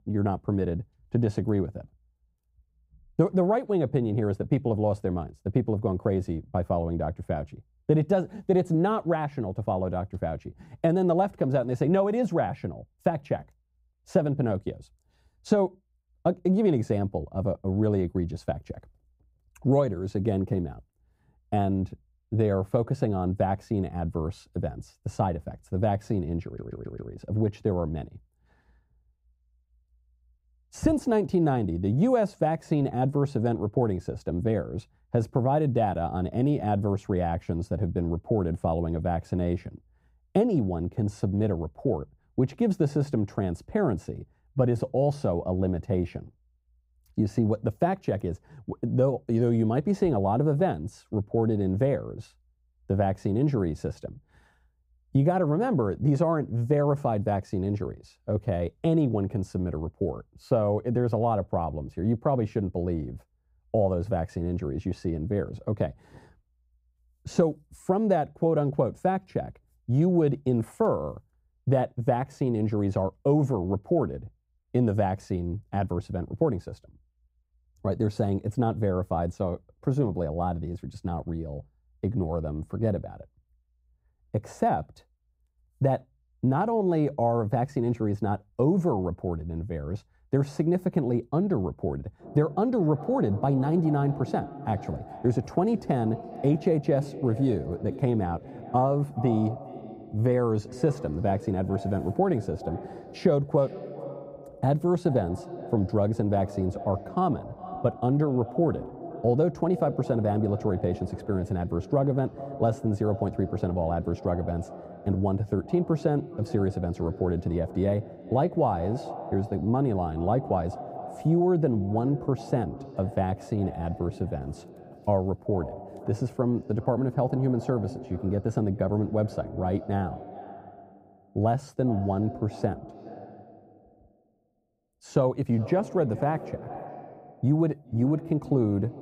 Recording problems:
muffled; very; fading above 1.5 kHz
echo of what is said; noticeable; from 1:32 on; 410 ms later, 15 dB below the speech
audio stuttering; at 26 s

